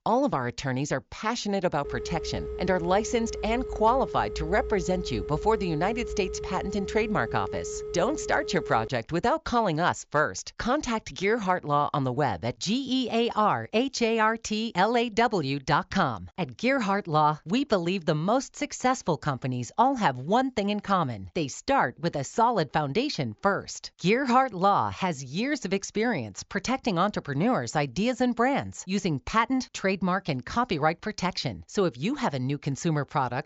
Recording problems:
high frequencies cut off; noticeable; nothing above 7.5 kHz
phone ringing; noticeable; from 2 to 9 s; peak 8 dB below the speech

